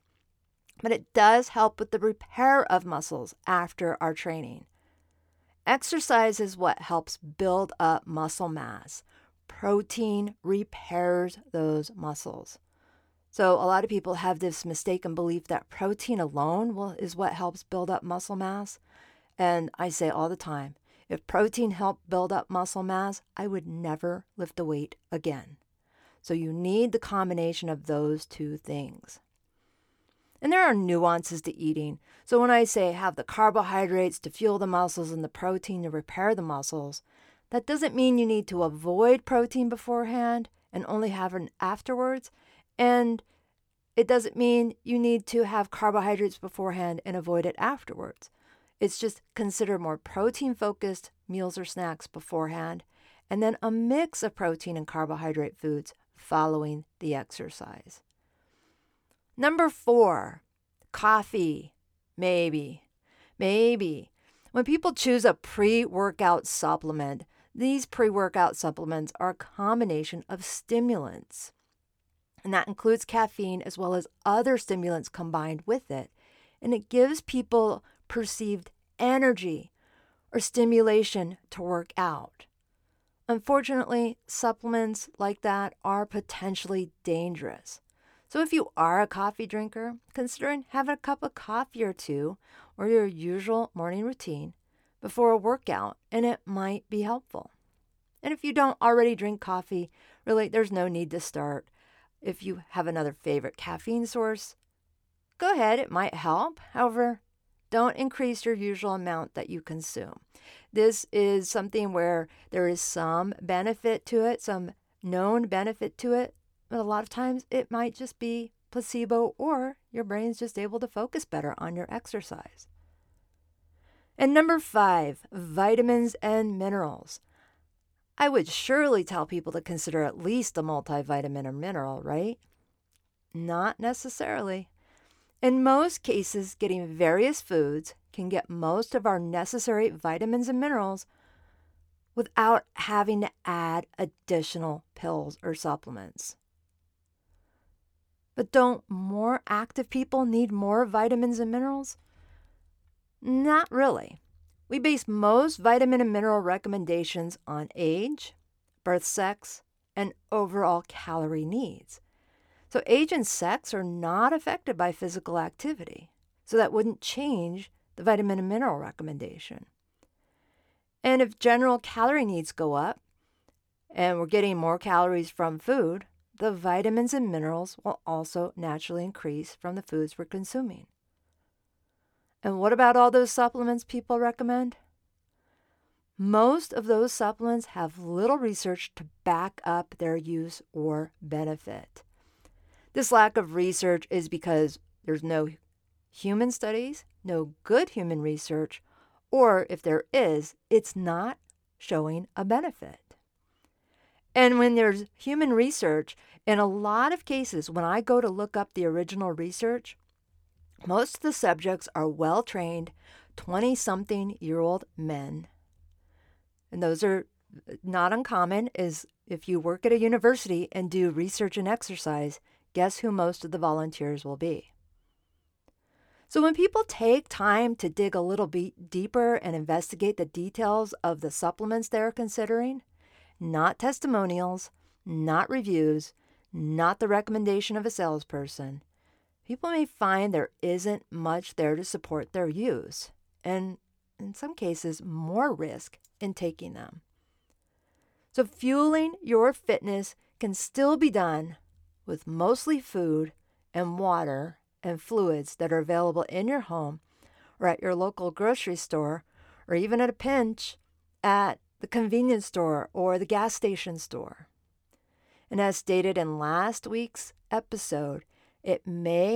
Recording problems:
abrupt cut into speech; at the end

